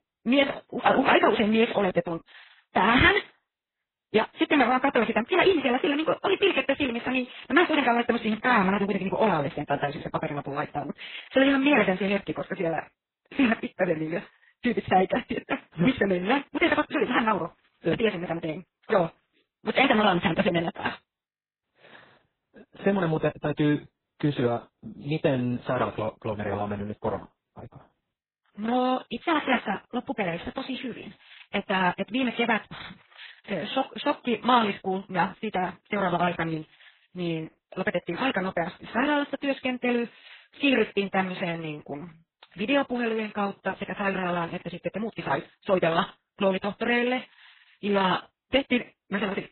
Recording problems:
garbled, watery; badly; nothing above 4 kHz
wrong speed, natural pitch; too fast; 1.5 times normal speed

